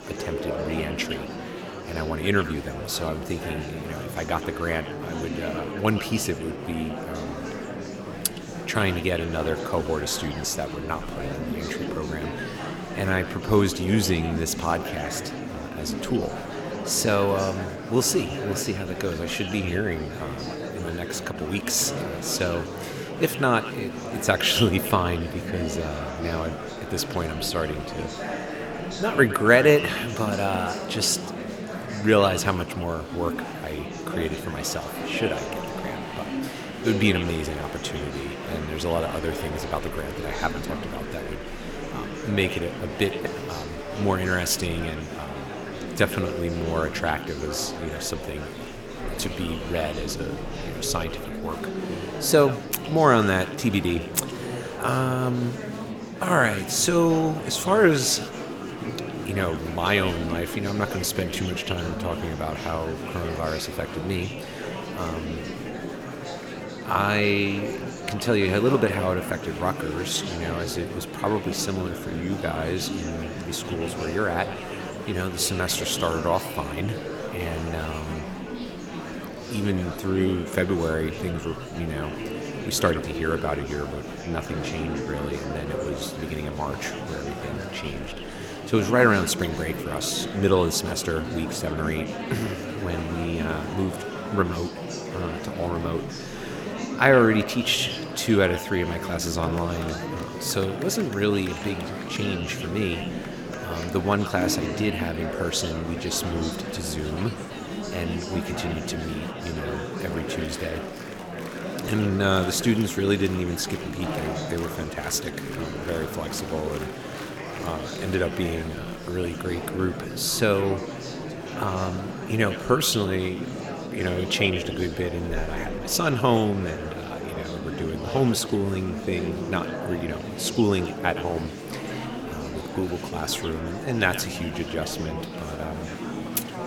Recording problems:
echo of what is said; noticeable; throughout; 110 ms later, 15 dB below the speech
murmuring crowd; loud; throughout; 7 dB below the speech

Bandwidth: 17.5 kHz